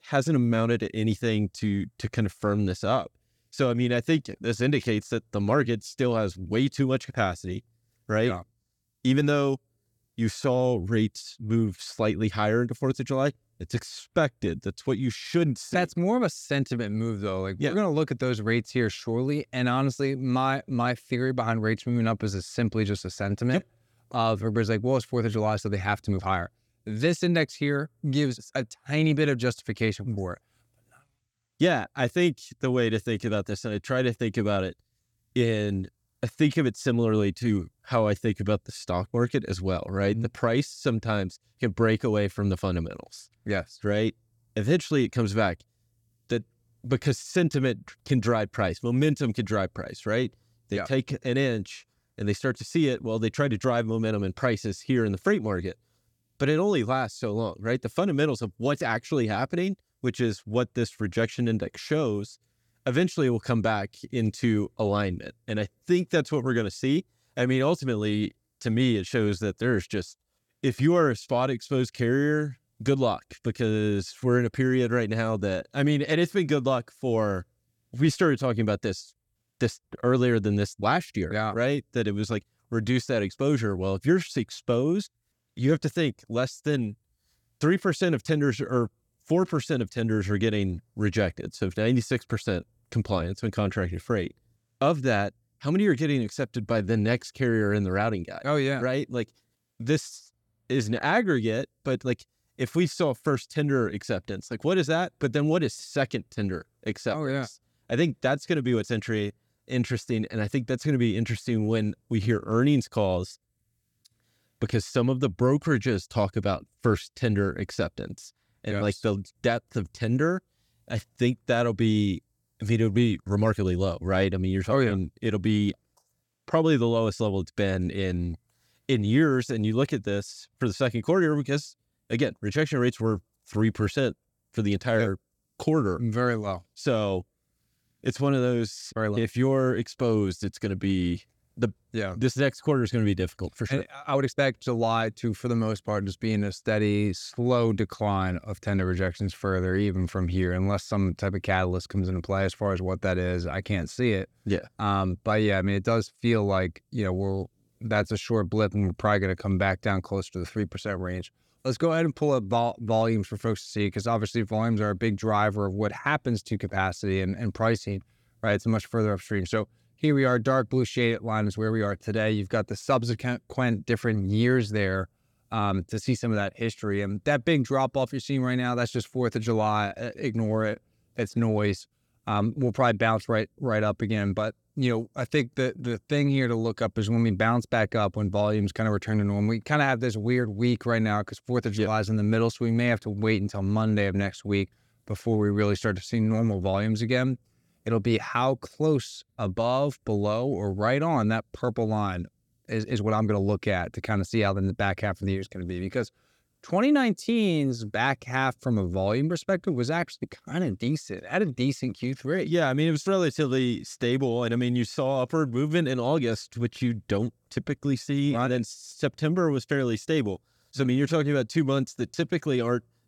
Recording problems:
uneven, jittery; strongly; from 26 s to 3:38

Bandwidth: 17.5 kHz